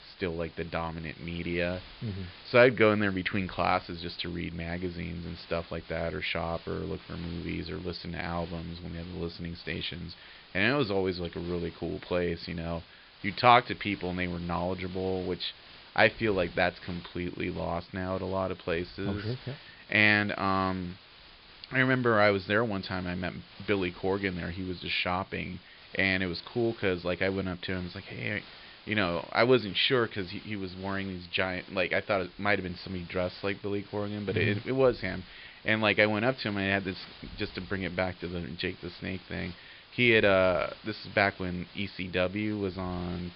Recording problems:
high frequencies cut off; noticeable; nothing above 5 kHz
hiss; faint; throughout; 20 dB below the speech

